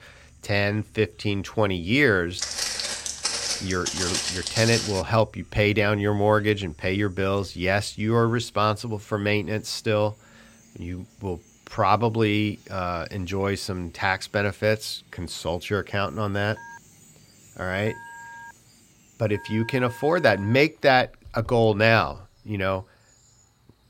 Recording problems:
animal sounds; faint; throughout; 30 dB below the speech
footsteps; noticeable; from 2.5 to 5 s; peak 1 dB below the speech
phone ringing; faint; from 17 to 21 s; peak 15 dB below the speech

